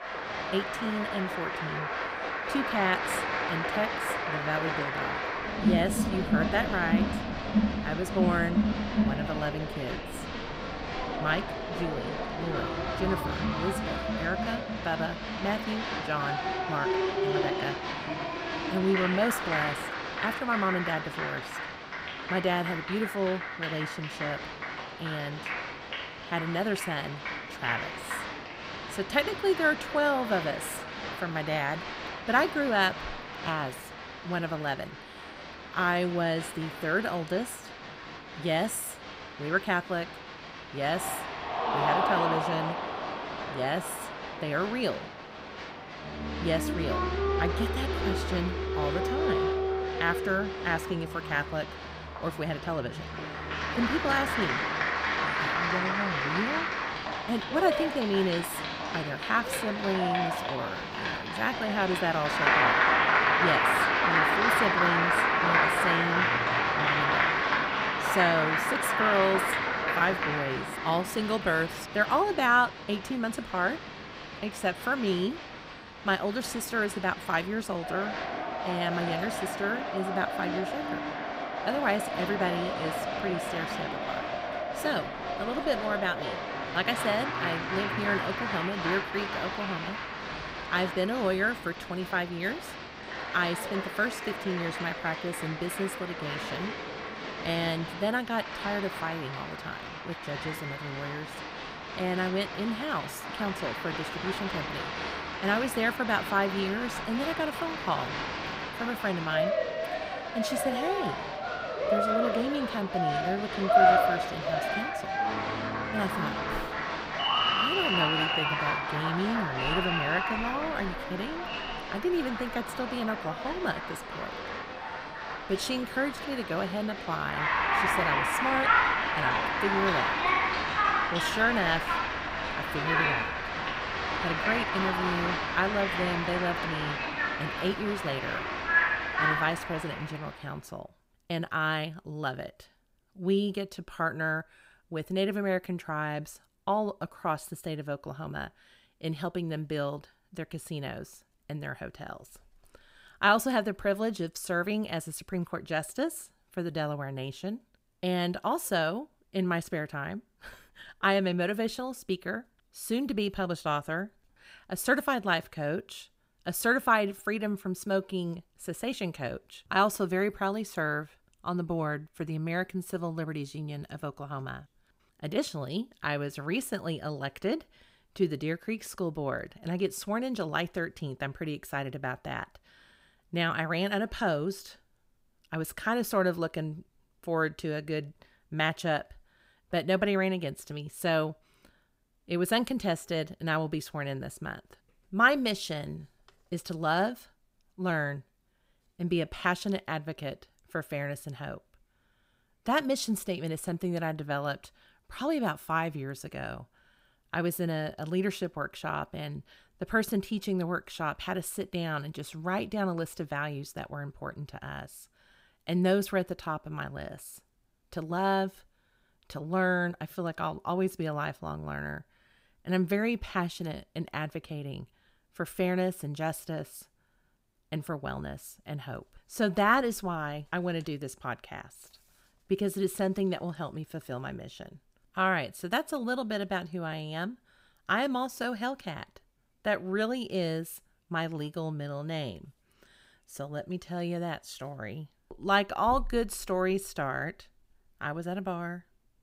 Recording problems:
crowd noise; very loud; until 2:20; 1 dB above the speech

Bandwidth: 15.5 kHz